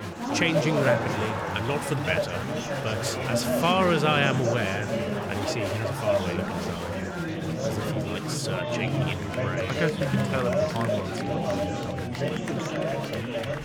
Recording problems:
chatter from many people; very loud; throughout; 1 dB above the speech

